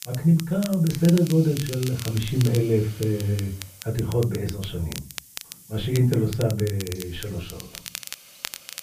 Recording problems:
off-mic speech; far
muffled; very; fading above 2.5 kHz
room echo; very slight; dies away in 0.3 s
crackle, like an old record; noticeable; 15 dB below the speech
hiss; faint; throughout; 20 dB below the speech

